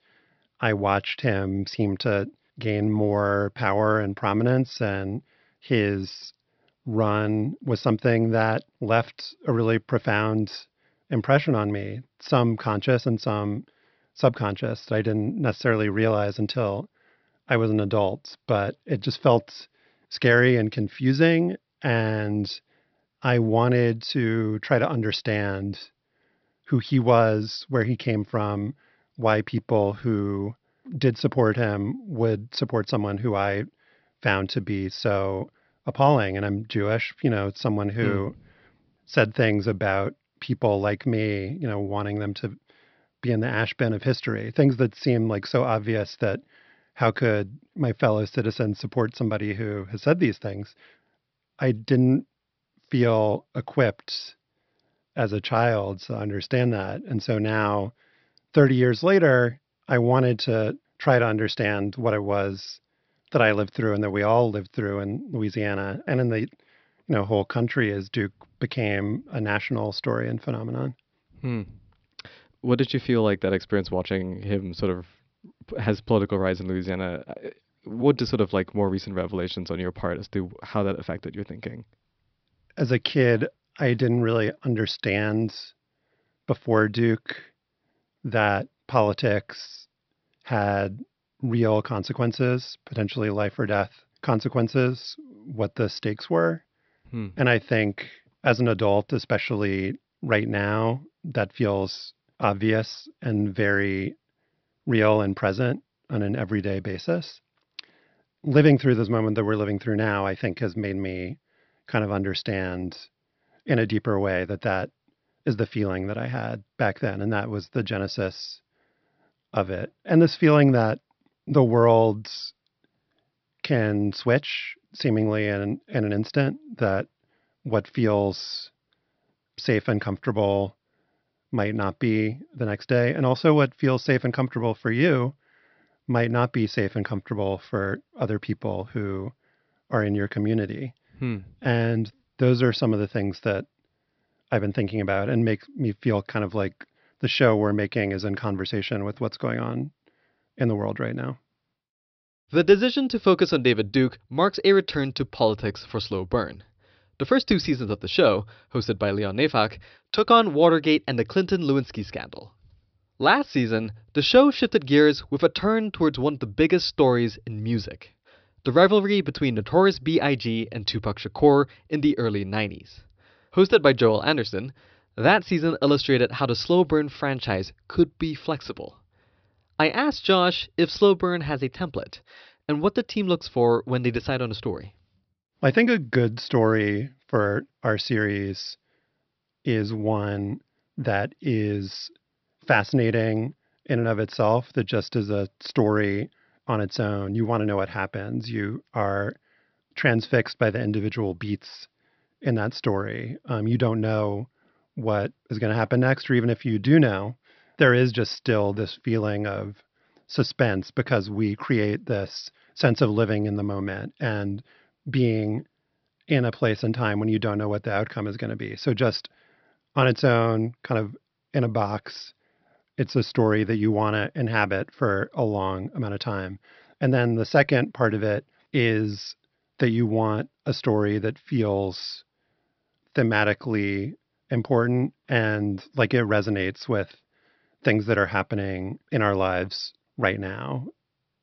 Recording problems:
high frequencies cut off; noticeable; nothing above 5.5 kHz

